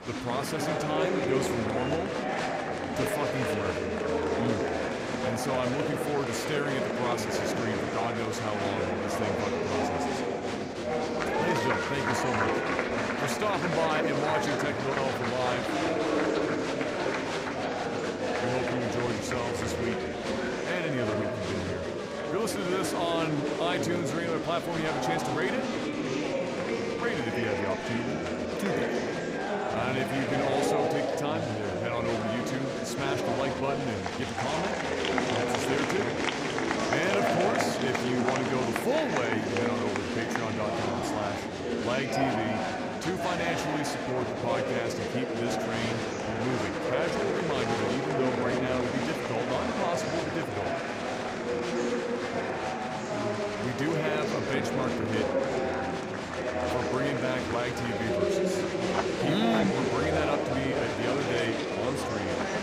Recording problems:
murmuring crowd; very loud; throughout; 3 dB above the speech

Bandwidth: 15.5 kHz